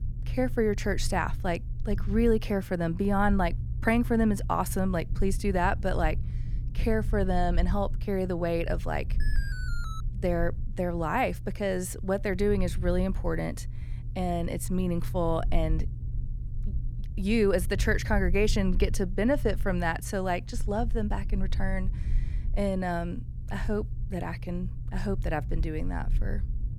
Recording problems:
low rumble; noticeable; throughout; 20 dB below the speech
alarm; faint; at 9 s; peak 10 dB below the speech

